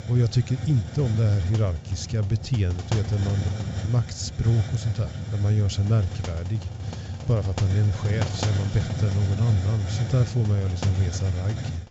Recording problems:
high frequencies cut off; noticeable; nothing above 7.5 kHz
hiss; loud; throughout; 7 dB below the speech

